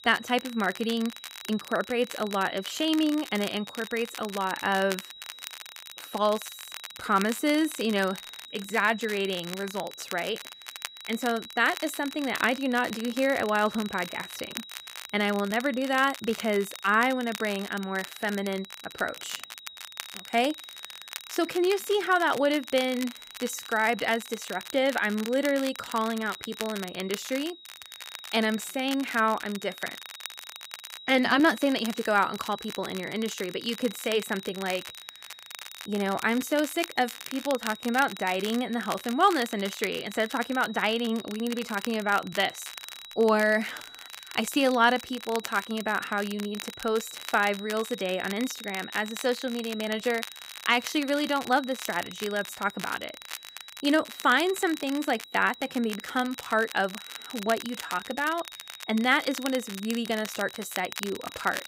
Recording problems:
high-pitched whine; noticeable; throughout; 4 kHz, 15 dB below the speech
crackle, like an old record; noticeable; 15 dB below the speech

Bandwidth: 15.5 kHz